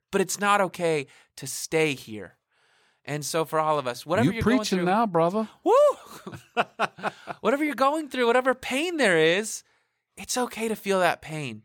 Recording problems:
none

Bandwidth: 17.5 kHz